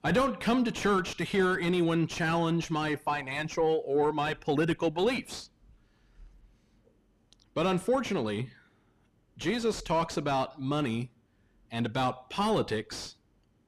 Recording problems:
distortion; heavy; 6 dB below the speech

